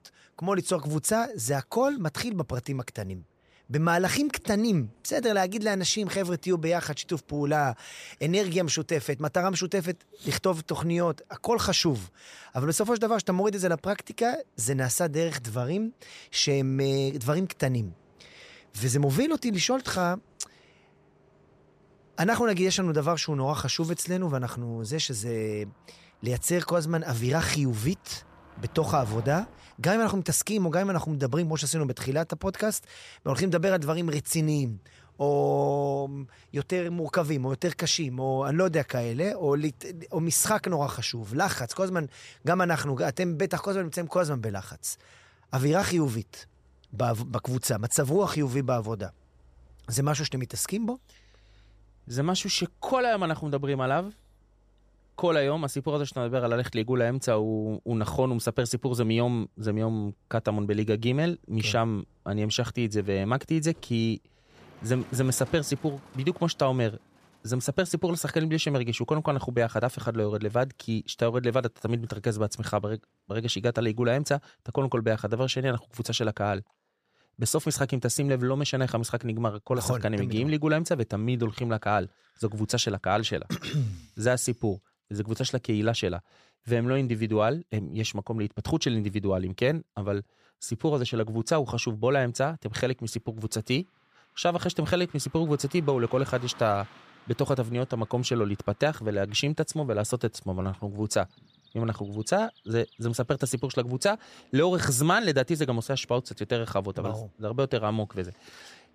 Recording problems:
traffic noise; faint; throughout; 30 dB below the speech

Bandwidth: 14.5 kHz